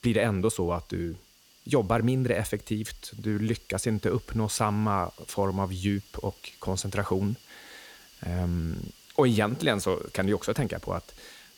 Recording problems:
hiss; faint; throughout; 25 dB below the speech

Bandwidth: 18.5 kHz